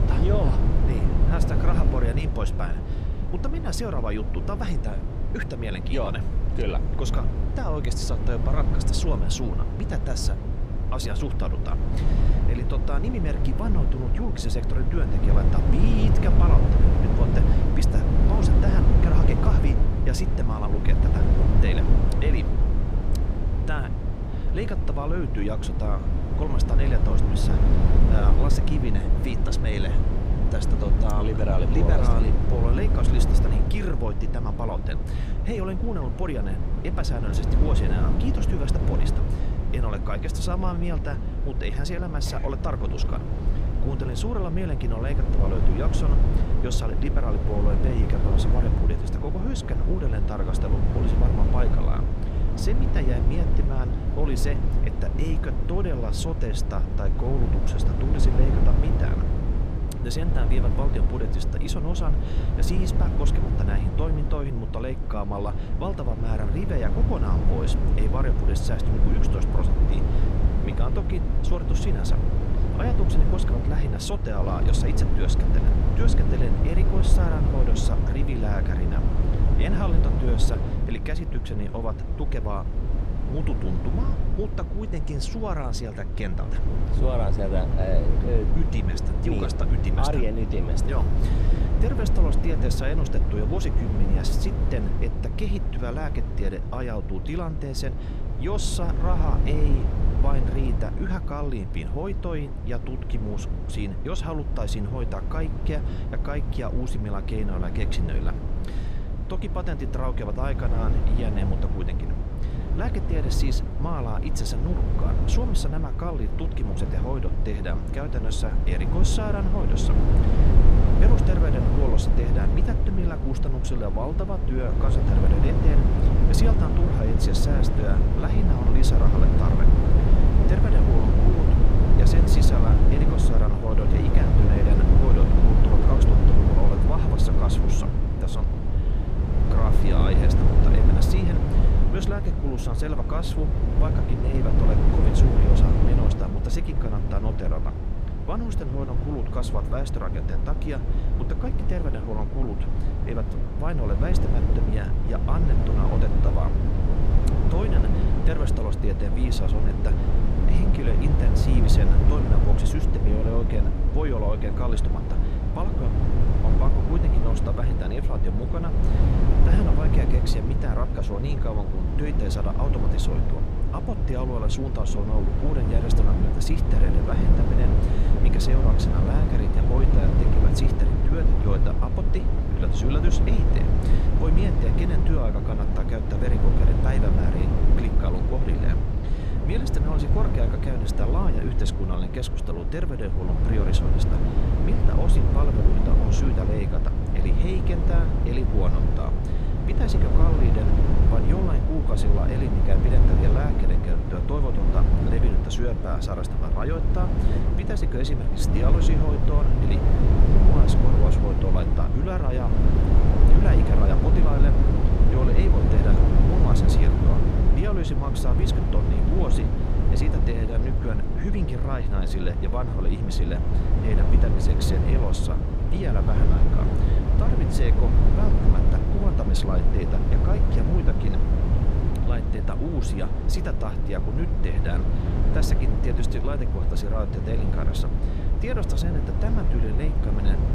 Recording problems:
low rumble; loud; throughout; as loud as the speech

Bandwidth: 15 kHz